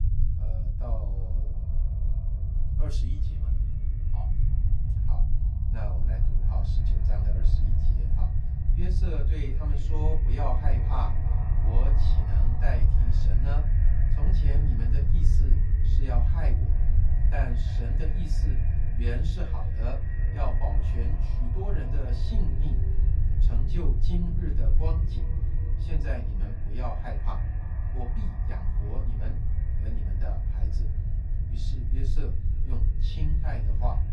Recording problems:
echo of what is said; strong; throughout; 330 ms later, 10 dB below the speech
off-mic speech; far
room echo; very slight; dies away in 0.2 s
low rumble; loud; throughout; 4 dB below the speech

